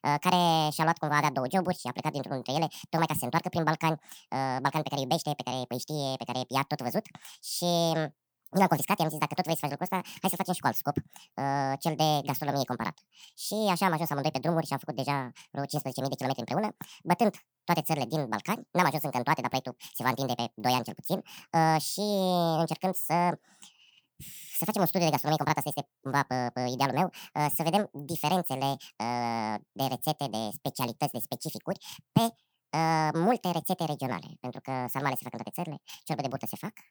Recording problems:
wrong speed and pitch; too fast and too high; 1.7 times normal speed

